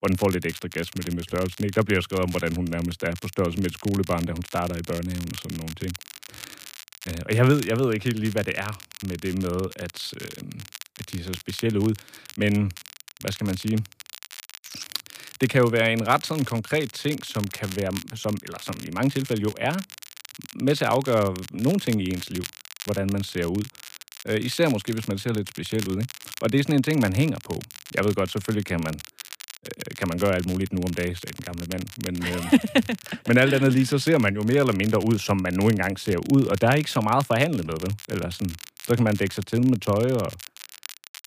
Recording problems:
crackle, like an old record; noticeable; 15 dB below the speech

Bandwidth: 15 kHz